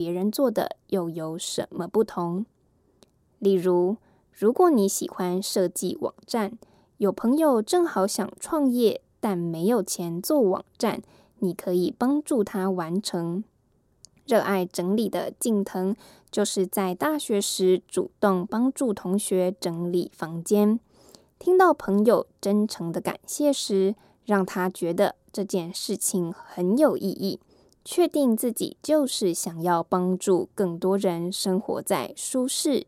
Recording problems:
abrupt cut into speech; at the start

